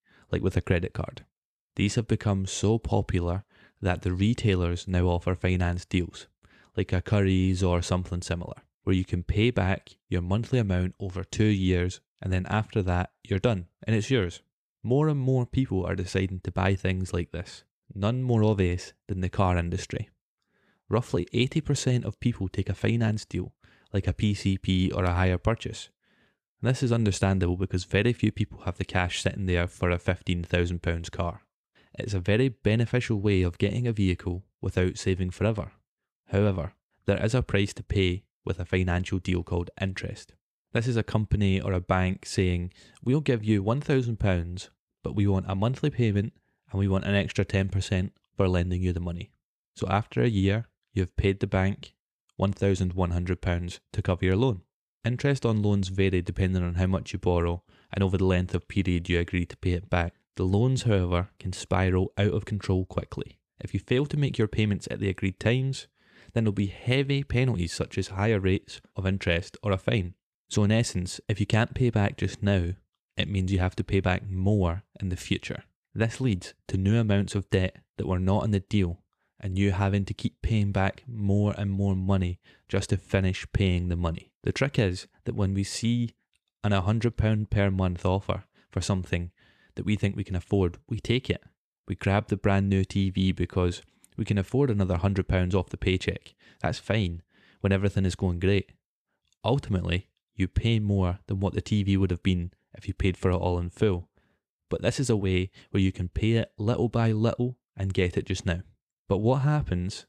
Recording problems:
none

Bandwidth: 14 kHz